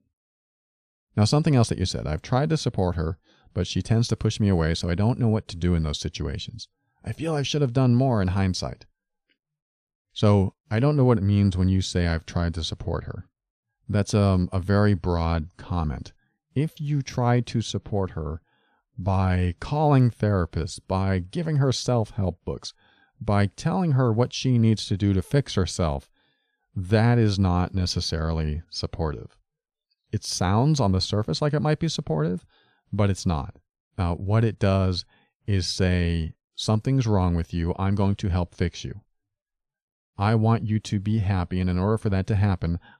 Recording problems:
none

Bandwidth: 13.5 kHz